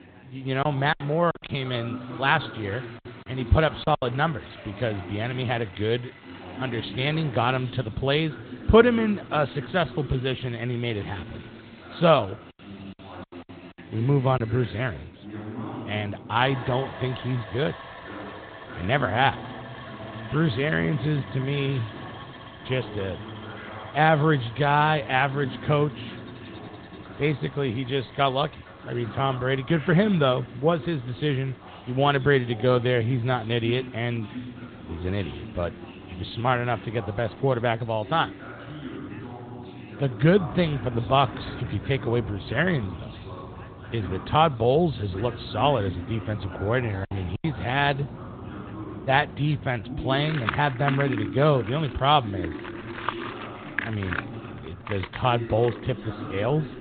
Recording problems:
high frequencies cut off; severe; nothing above 3.5 kHz
garbled, watery; slightly
machinery noise; noticeable; throughout; 15 dB below the speech
chatter from many people; noticeable; throughout; 15 dB below the speech
choppy; very; from 0.5 to 4 s, at 14 s and at 47 s; 9% of the speech affected

